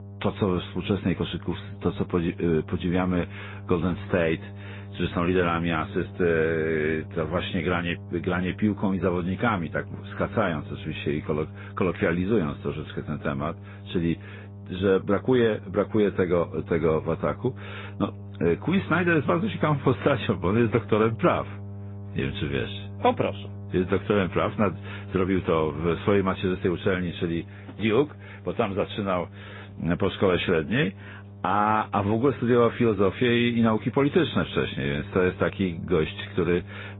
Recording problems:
high frequencies cut off; severe; nothing above 3.5 kHz
garbled, watery; slightly
electrical hum; faint; throughout; 50 Hz, 25 dB below the speech

